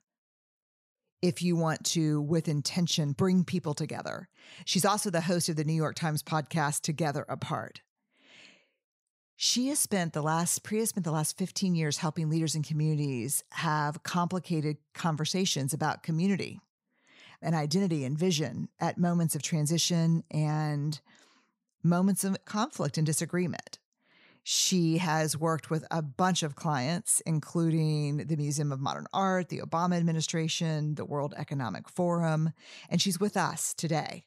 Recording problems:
none

